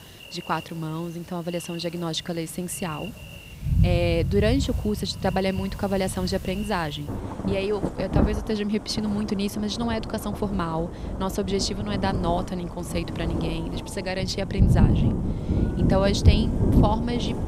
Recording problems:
rain or running water; very loud; throughout; 1 dB above the speech

